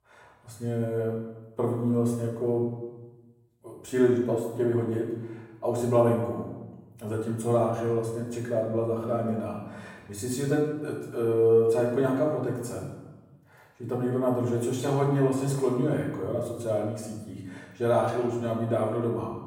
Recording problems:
off-mic speech; far
room echo; noticeable; dies away in 0.9 s

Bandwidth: 16.5 kHz